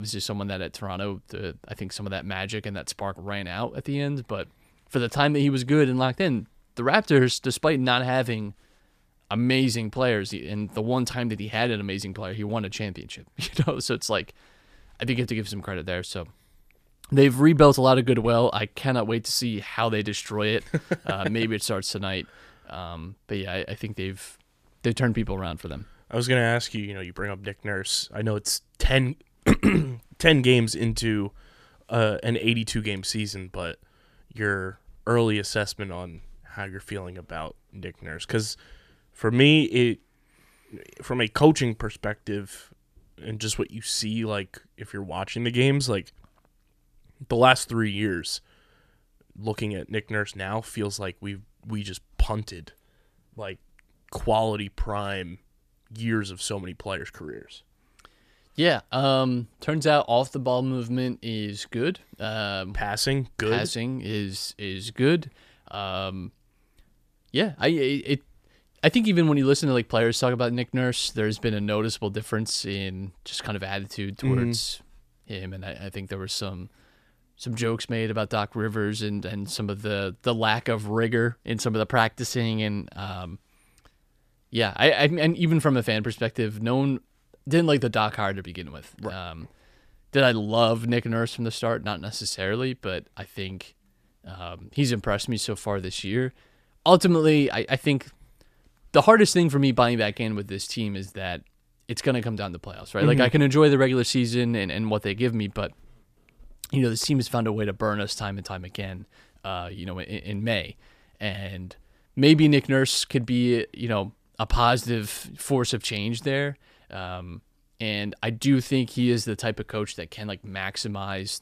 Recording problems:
abrupt cut into speech; at the start

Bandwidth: 14.5 kHz